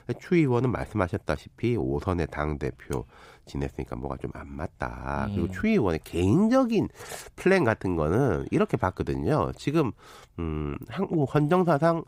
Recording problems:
none

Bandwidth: 15.5 kHz